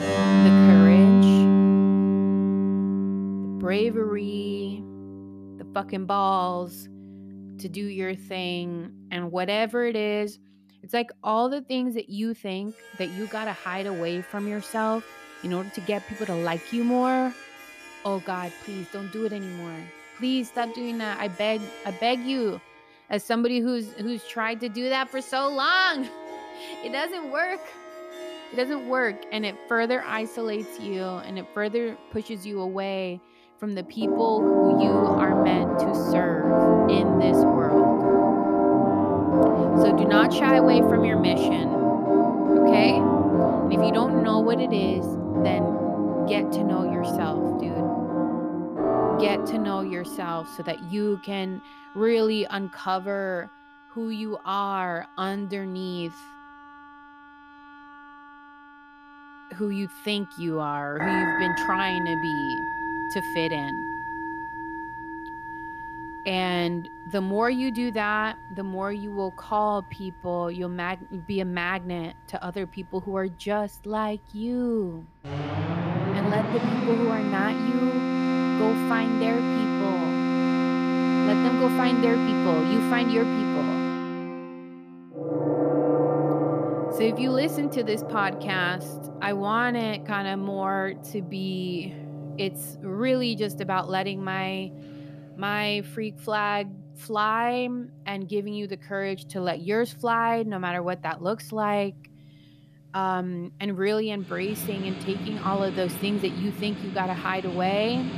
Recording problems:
background music; very loud; throughout; 5 dB above the speech

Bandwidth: 14.5 kHz